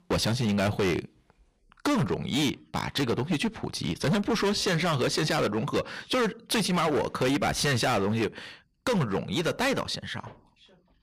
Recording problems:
distortion; heavy; 17% of the sound clipped

